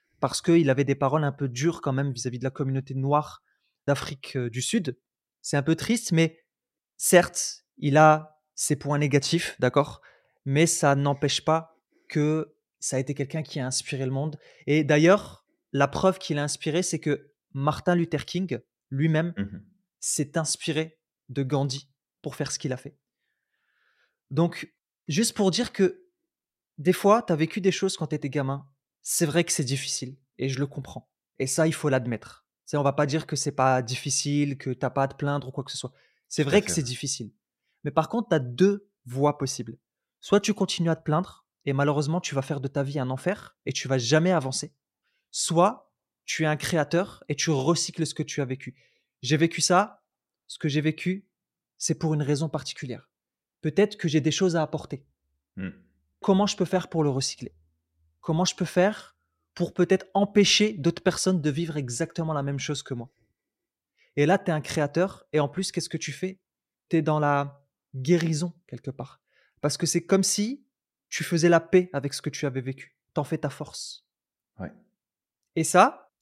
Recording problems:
none

